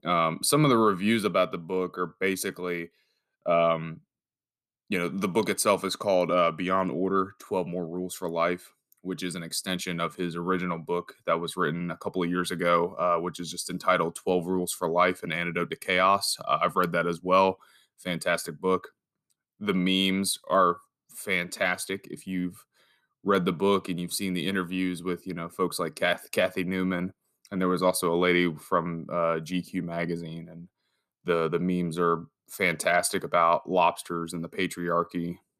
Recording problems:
none

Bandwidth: 14.5 kHz